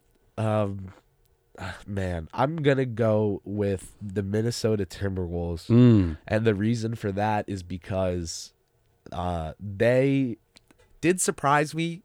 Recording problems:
none

